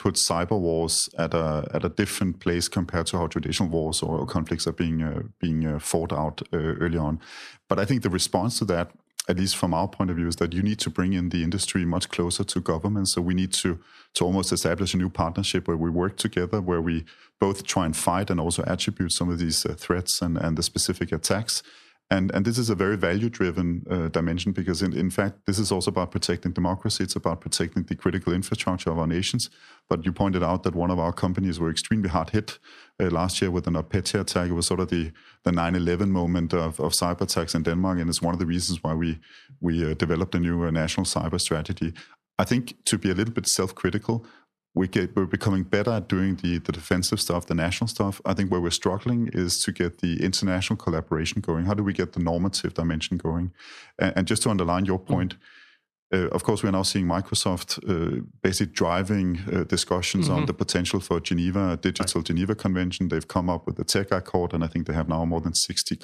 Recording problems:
squashed, flat; somewhat

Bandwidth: 13.5 kHz